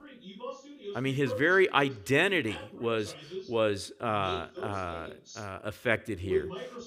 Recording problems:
voice in the background; noticeable; throughout; 10 dB below the speech

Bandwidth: 15.5 kHz